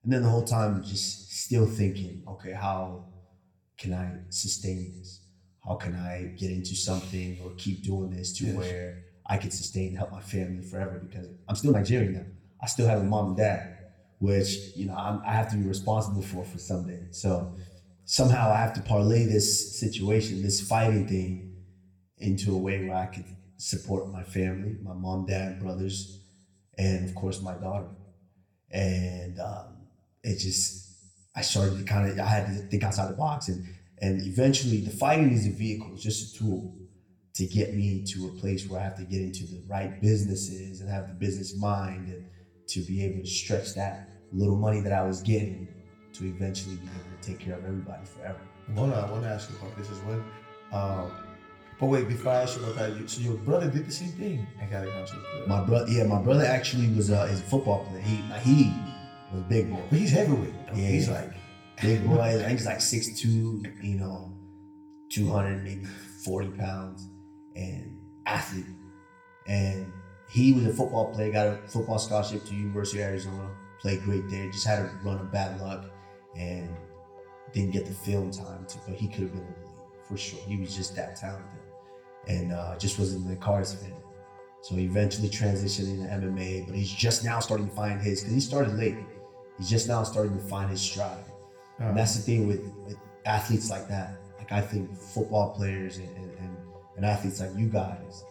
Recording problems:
room echo; very slight; dies away in 0.7 s
off-mic speech; somewhat distant
background music; faint; from 42 s on; 20 dB below the speech
uneven, jittery; strongly; from 9 s to 1:28

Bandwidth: 17.5 kHz